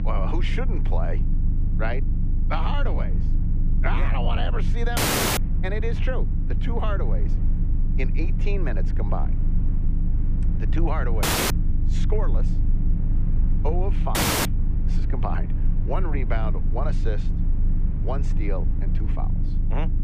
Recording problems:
muffled; very; fading above 2.5 kHz
low rumble; loud; throughout; 8 dB below the speech
electrical hum; faint; throughout; 50 Hz, 25 dB below the speech
audio cutting out; at 5 s, at 11 s and at 14 s

